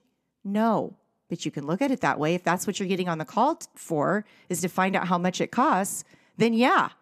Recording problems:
none

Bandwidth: 14 kHz